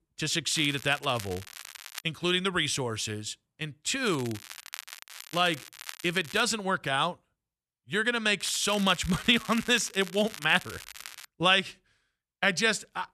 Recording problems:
crackling; noticeable; from 0.5 to 2 s, from 4 to 6.5 s and from 8.5 to 11 s; 15 dB below the speech

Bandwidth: 13.5 kHz